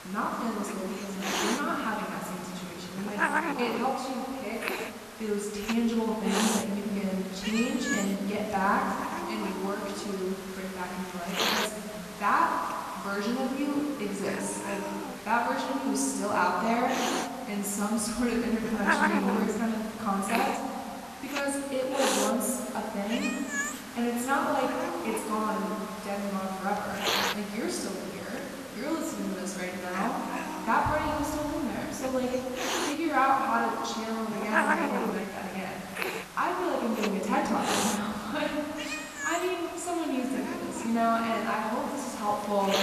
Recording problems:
off-mic speech; far
room echo; noticeable; dies away in 2.6 s
hiss; loud; throughout; 5 dB below the speech

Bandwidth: 13.5 kHz